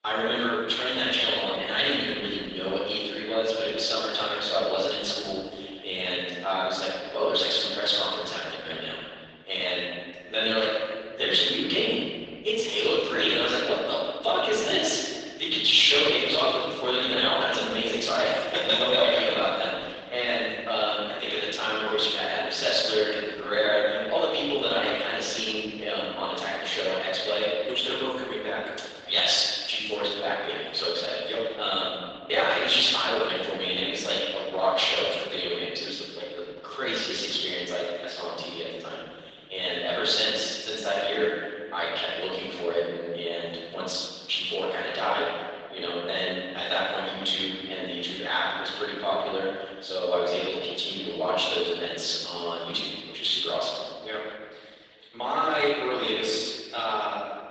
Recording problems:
room echo; strong; dies away in 1.7 s
off-mic speech; far
thin; somewhat; fading below 500 Hz
garbled, watery; slightly

